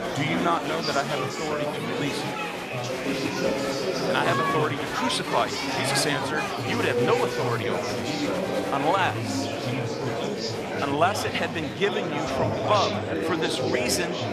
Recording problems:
chatter from many people; very loud; throughout; as loud as the speech

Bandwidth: 14.5 kHz